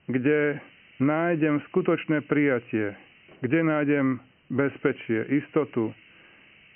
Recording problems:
high frequencies cut off; severe; nothing above 3 kHz
hiss; faint; throughout; 25 dB below the speech

